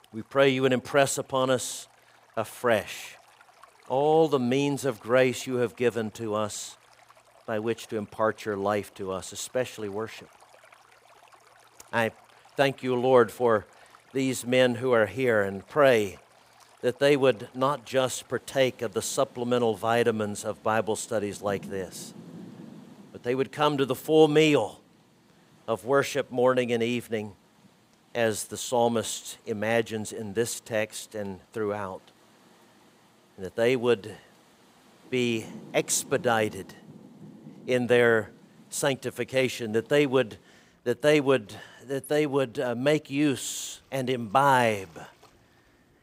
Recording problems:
rain or running water; faint; throughout; 25 dB below the speech

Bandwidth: 15.5 kHz